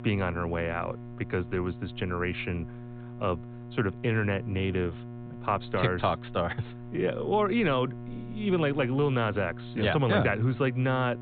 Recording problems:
high frequencies cut off; severe; nothing above 4 kHz
electrical hum; noticeable; throughout; 60 Hz, 20 dB below the speech

